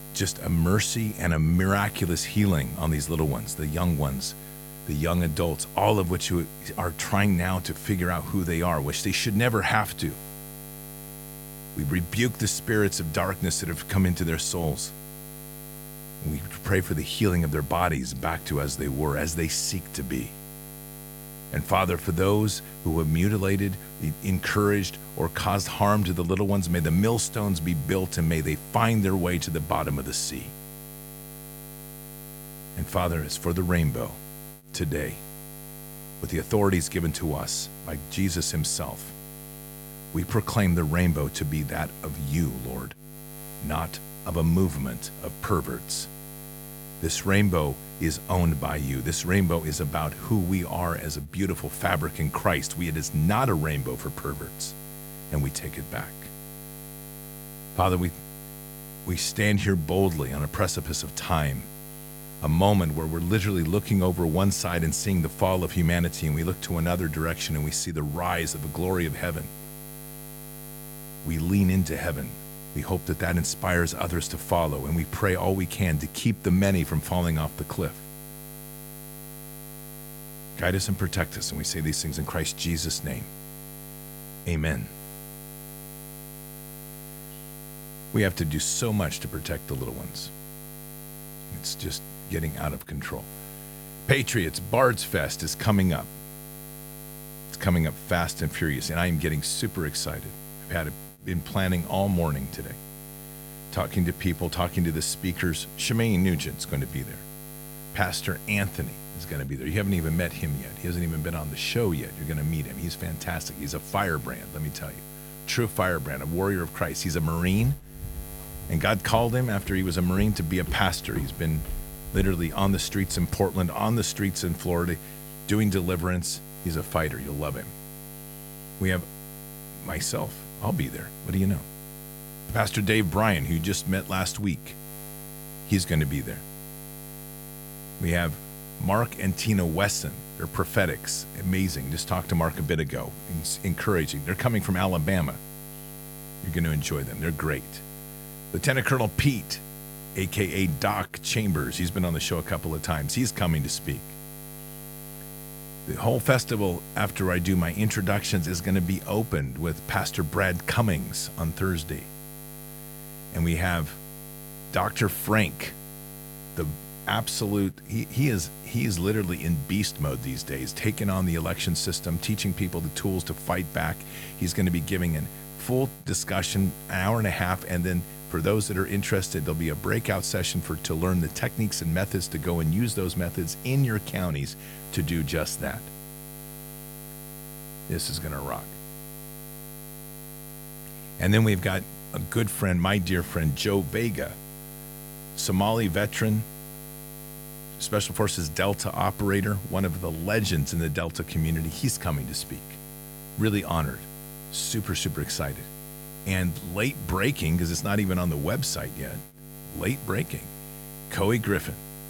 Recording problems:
electrical hum; noticeable; throughout; 60 Hz, 15 dB below the speech
footsteps; noticeable; from 1:57 to 2:03; peak 9 dB below the speech

